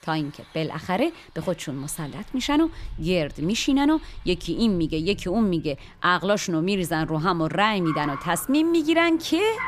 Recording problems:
traffic noise; noticeable; throughout; 20 dB below the speech

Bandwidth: 14.5 kHz